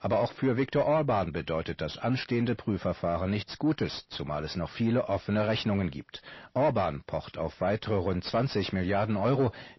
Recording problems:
distortion; slight; 10 dB below the speech
garbled, watery; slightly; nothing above 5.5 kHz

